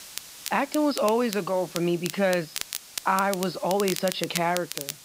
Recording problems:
high frequencies cut off; noticeable; nothing above 5.5 kHz
crackle, like an old record; loud; 9 dB below the speech
hiss; noticeable; throughout; 20 dB below the speech

